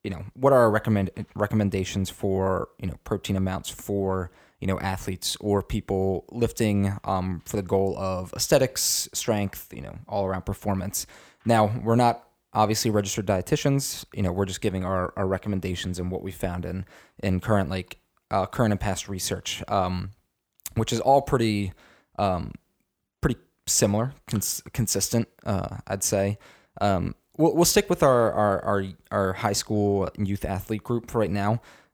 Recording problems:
none

